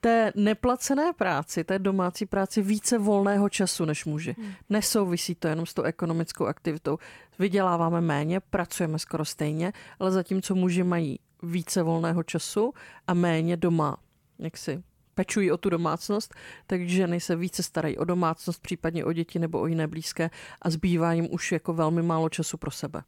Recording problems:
none

